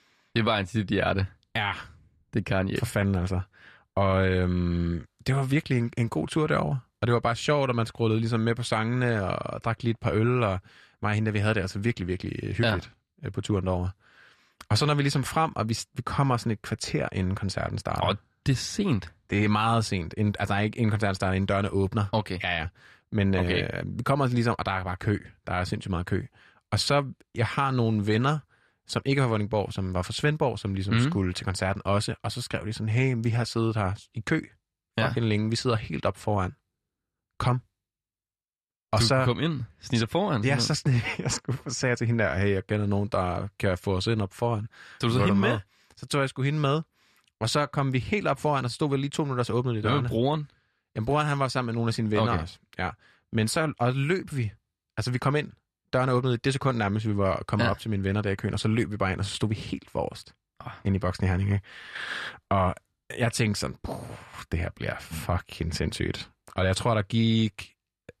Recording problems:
none

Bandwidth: 13.5 kHz